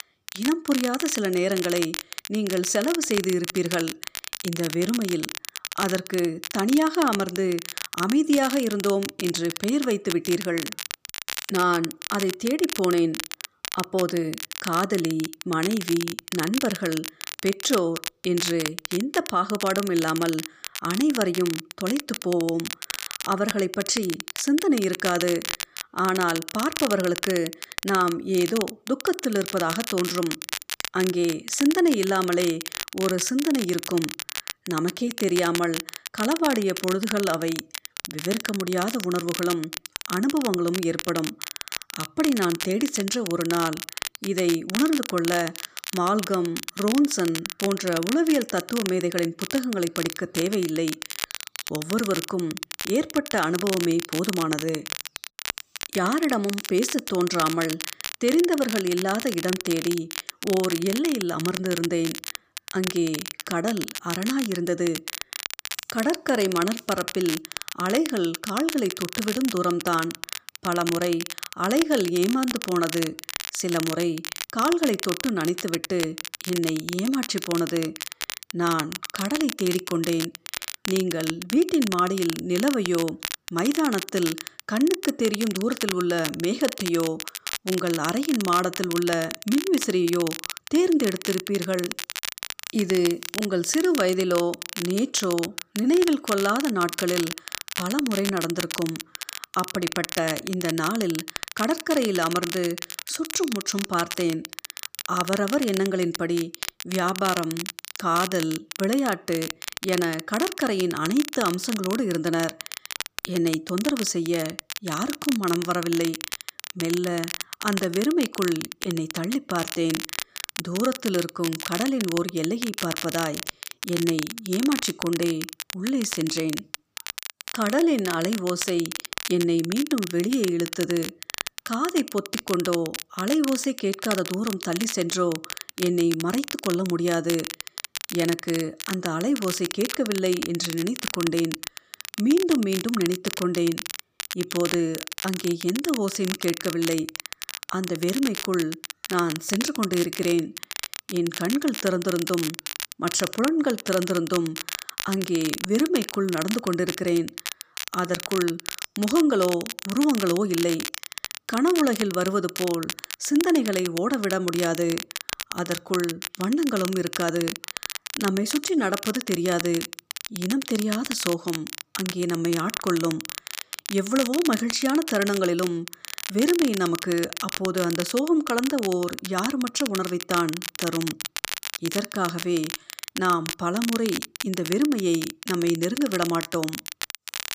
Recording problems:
crackle, like an old record; loud; 7 dB below the speech

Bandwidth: 15 kHz